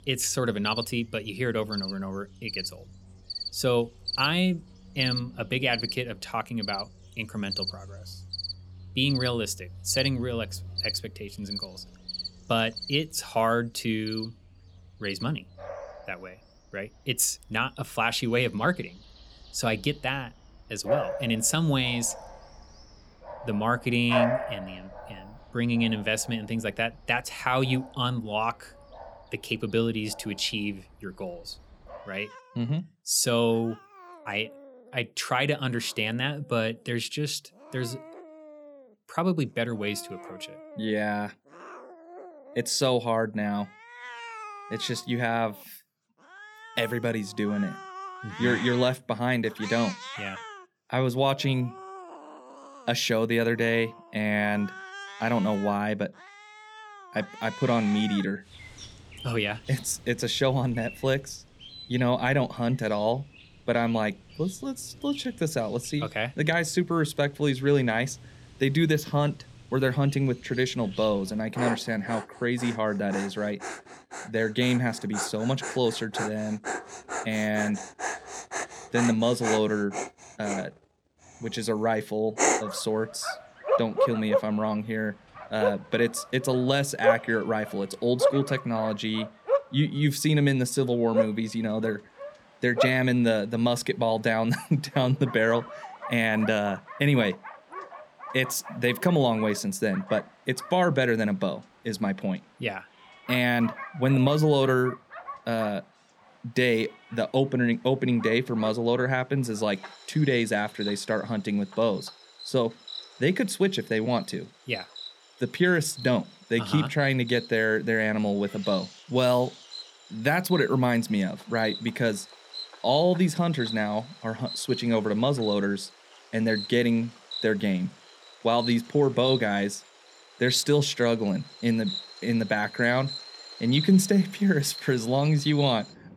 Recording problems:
animal sounds; loud; throughout; 9 dB below the speech

